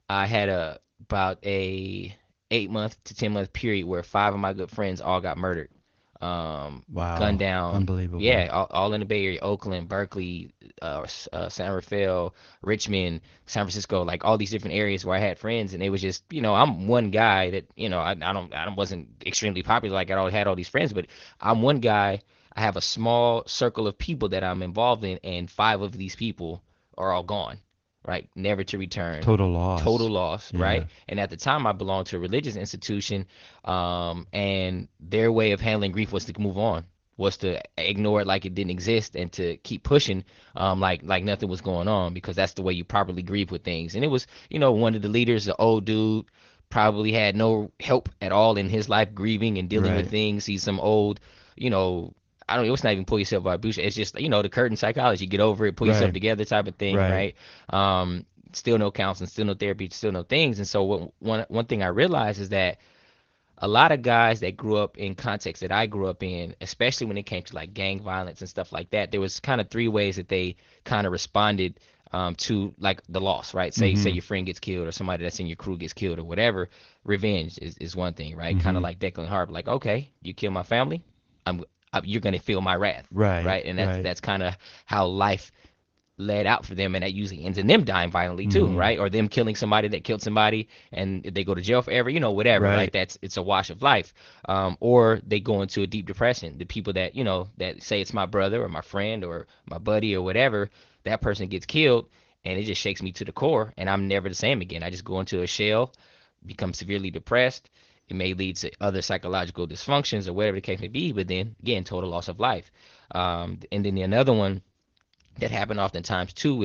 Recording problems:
garbled, watery; slightly; nothing above 6.5 kHz
abrupt cut into speech; at the end

